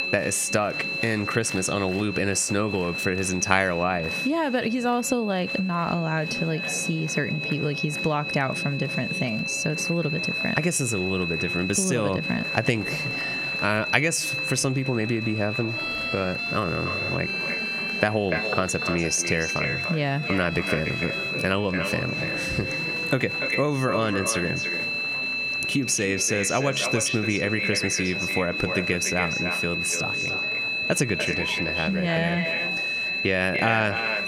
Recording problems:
echo of what is said; strong; from 17 s on; 290 ms later, 7 dB below the speech
squashed, flat; somewhat
high-pitched whine; loud; throughout; 2.5 kHz, 3 dB below the speech
background music; noticeable; throughout; 20 dB below the speech
murmuring crowd; noticeable; throughout; 15 dB below the speech

